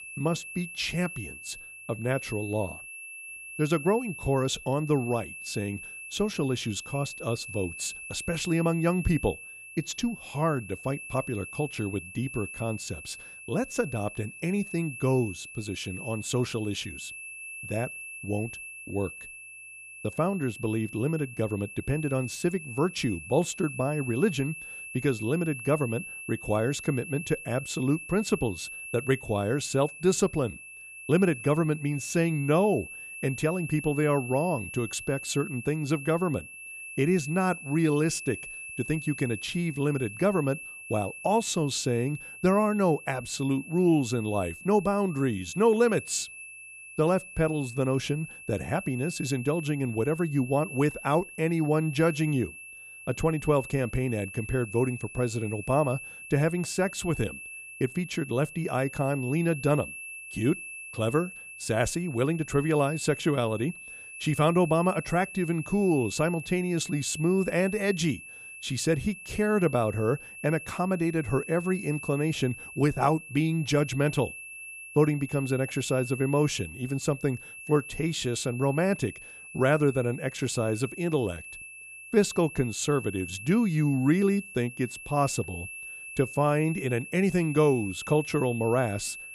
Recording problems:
high-pitched whine; noticeable; throughout; 2.5 kHz, 10 dB below the speech

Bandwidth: 14.5 kHz